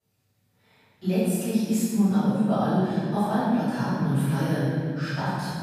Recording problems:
room echo; strong; dies away in 2.6 s
off-mic speech; far

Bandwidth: 15 kHz